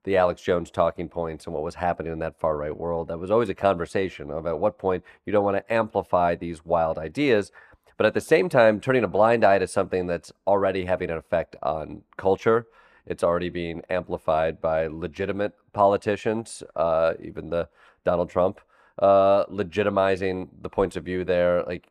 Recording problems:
muffled; slightly; fading above 3 kHz

